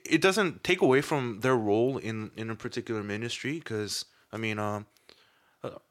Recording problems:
none

